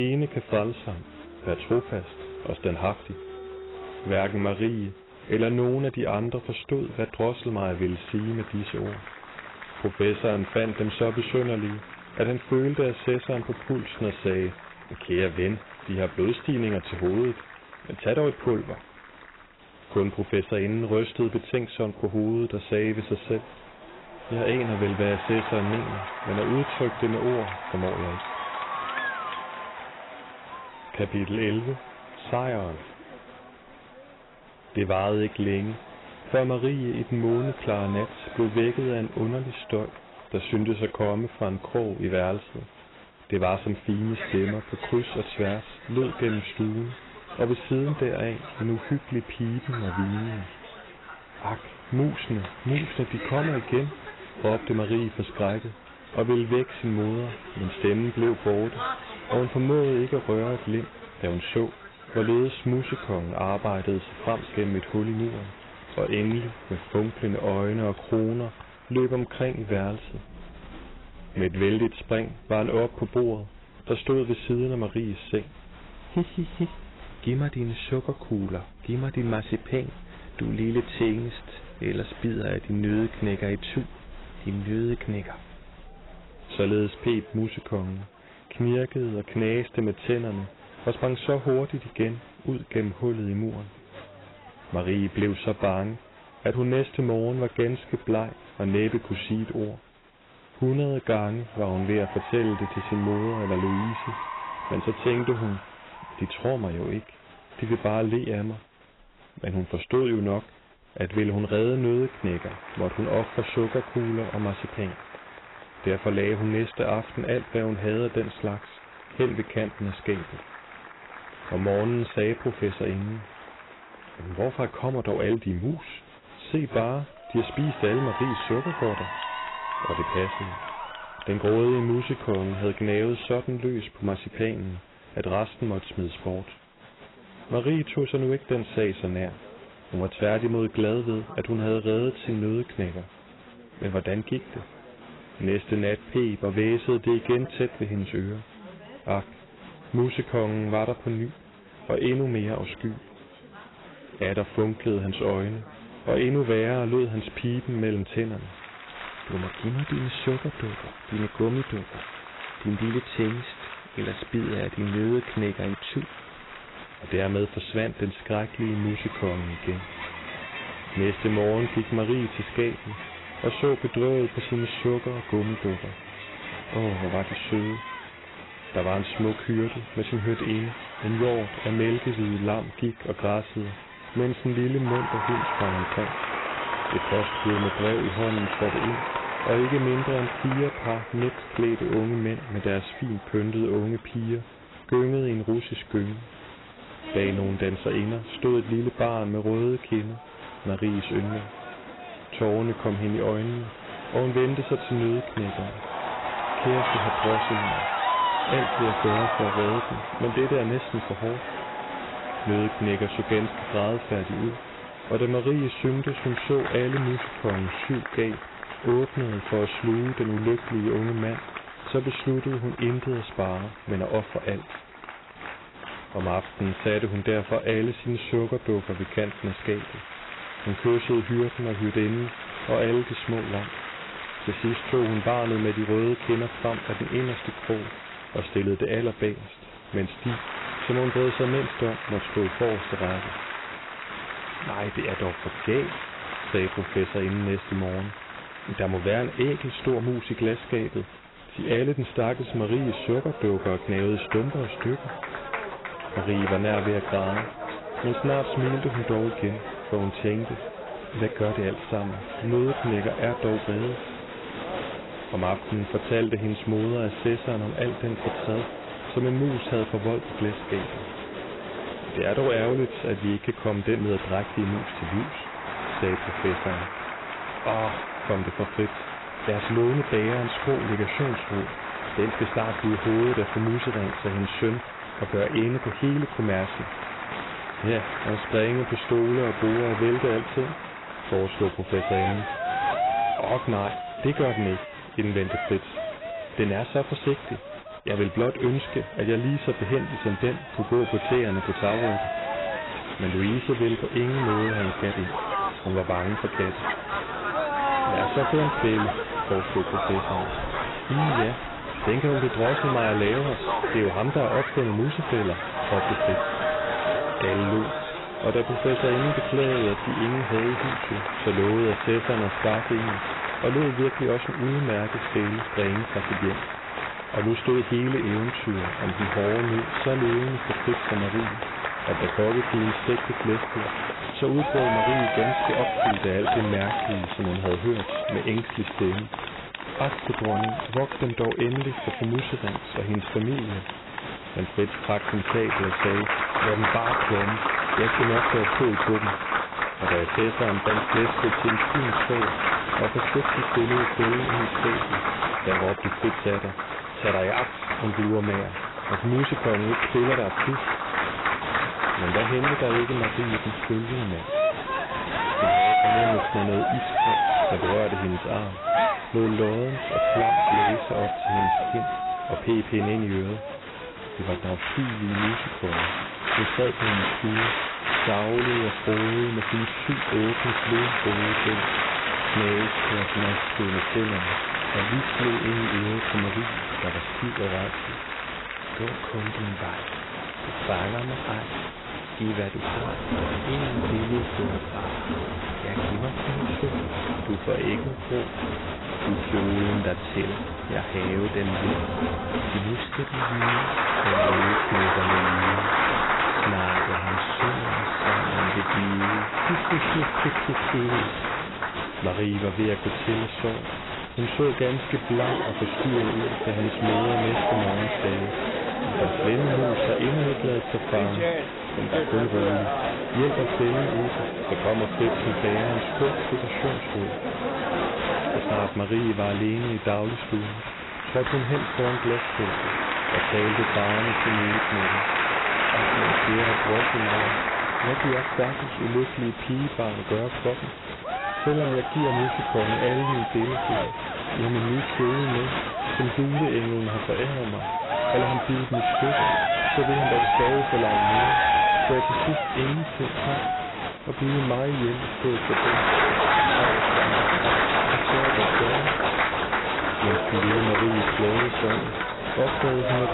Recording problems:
garbled, watery; badly; nothing above 4 kHz
distortion; slight; 4% of the sound clipped
crowd noise; loud; throughout; 1 dB below the speech
abrupt cut into speech; at the start

